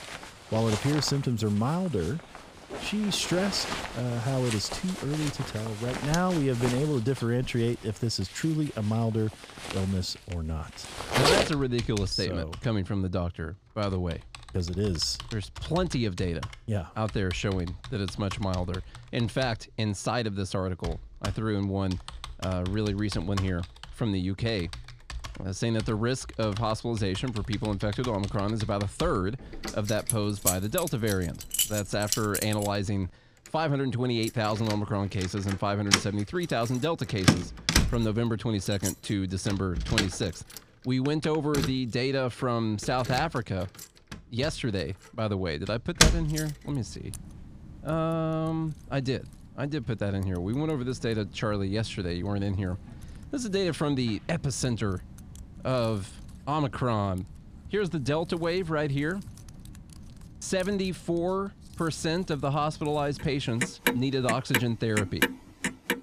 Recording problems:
household noises; loud; throughout; 3 dB below the speech

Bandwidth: 15 kHz